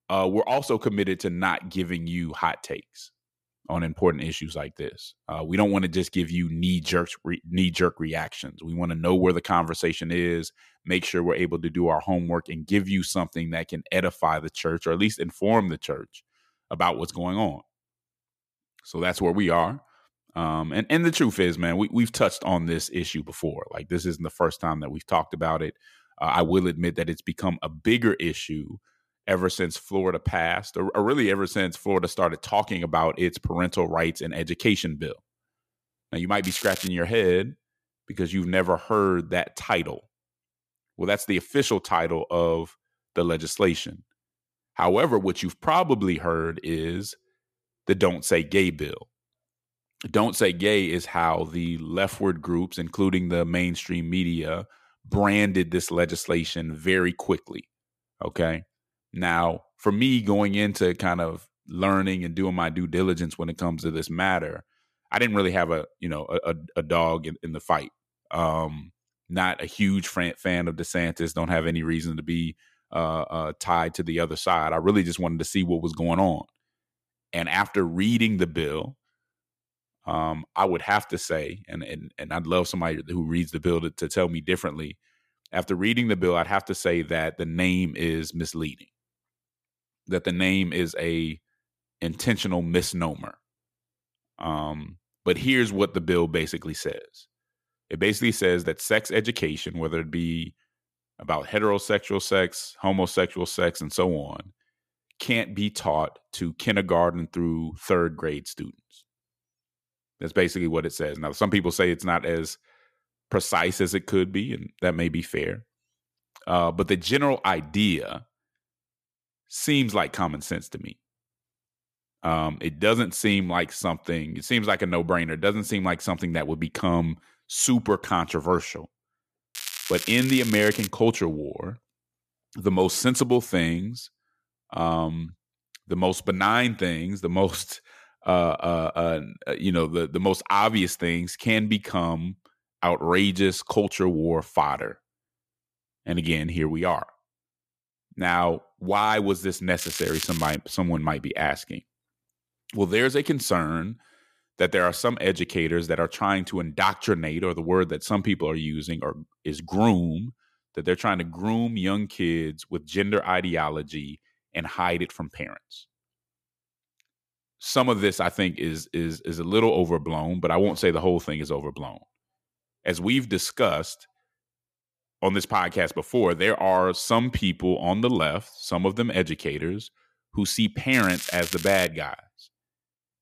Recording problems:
crackling; loud; 4 times, first at 36 s; 8 dB below the speech

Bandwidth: 14.5 kHz